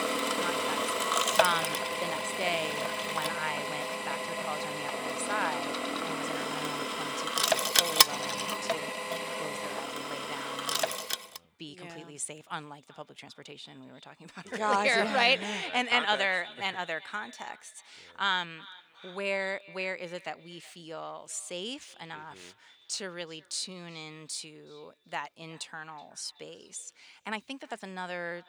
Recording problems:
thin; somewhat; fading below 850 Hz
echo of what is said; faint; throughout; 370 ms later, 20 dB below the speech
machinery noise; very loud; until 11 s; 4 dB above the speech
uneven, jittery; strongly; from 1.5 to 28 s

